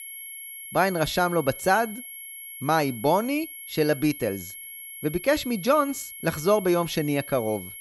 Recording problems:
high-pitched whine; noticeable; throughout; 11.5 kHz, 10 dB below the speech

